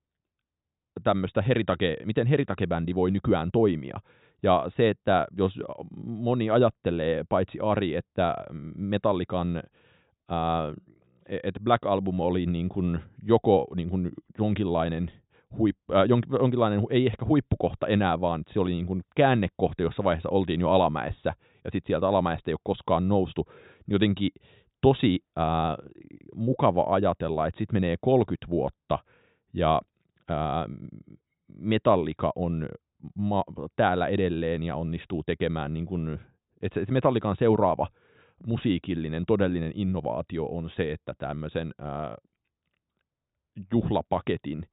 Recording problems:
high frequencies cut off; severe; nothing above 4 kHz

